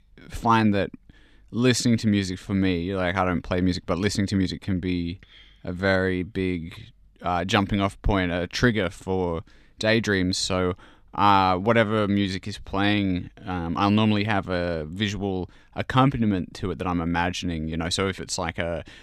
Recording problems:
none

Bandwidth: 14.5 kHz